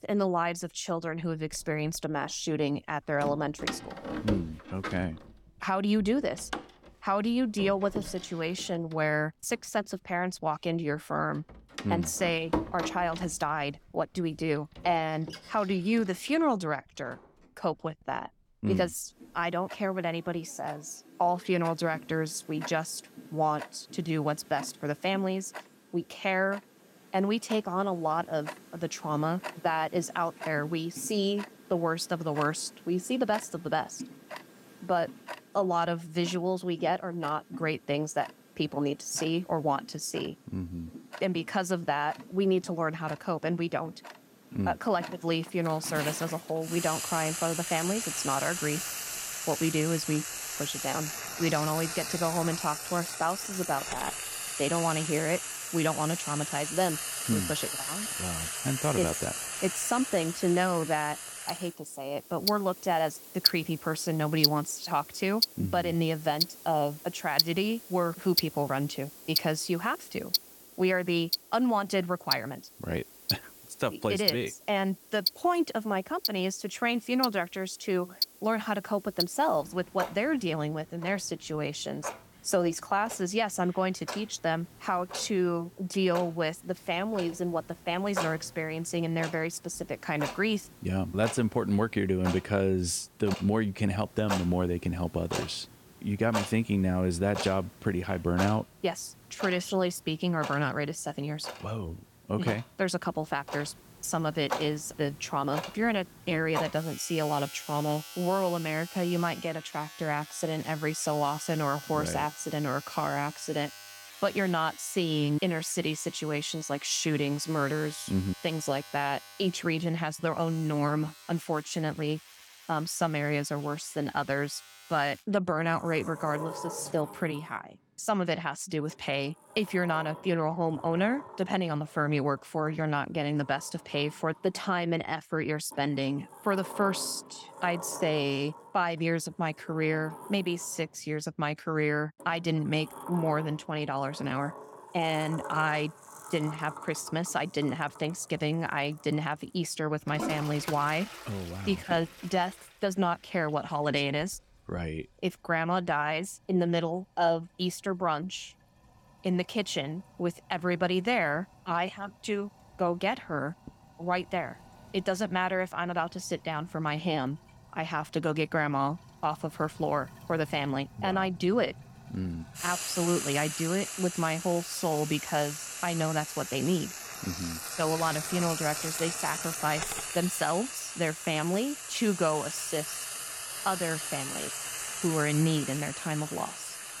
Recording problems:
household noises; loud; throughout; 6 dB below the speech

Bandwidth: 17 kHz